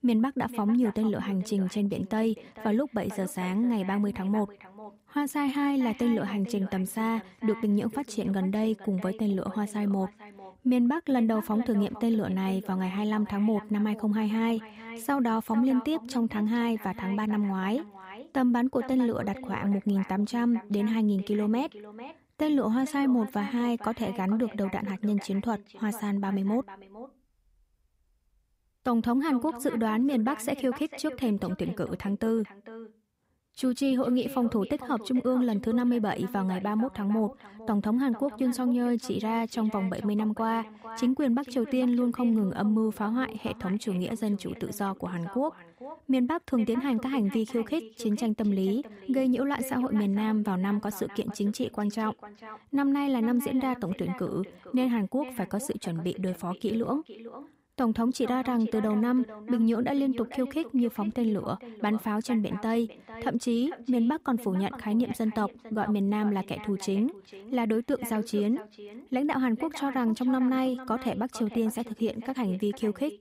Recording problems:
echo of what is said; noticeable; throughout; 450 ms later, 15 dB below the speech

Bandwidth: 15.5 kHz